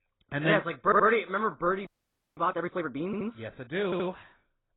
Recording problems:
garbled, watery; badly; nothing above 4 kHz
audio stuttering; at 1 s, at 3 s and at 4 s
audio freezing; at 2 s for 0.5 s

